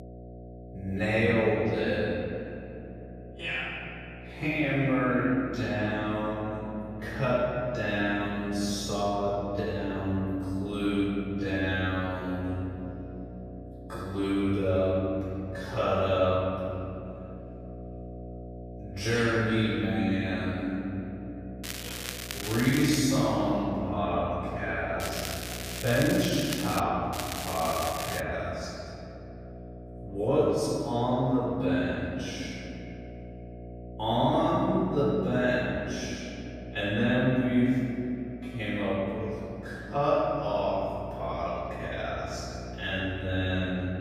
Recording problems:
room echo; strong; dies away in 2.5 s
off-mic speech; far
wrong speed, natural pitch; too slow; 0.5 times normal speed
crackling; loud; from 22 to 23 s, from 25 to 27 s and from 27 to 28 s; 8 dB below the speech
electrical hum; noticeable; throughout; 60 Hz, 20 dB below the speech

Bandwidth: 15 kHz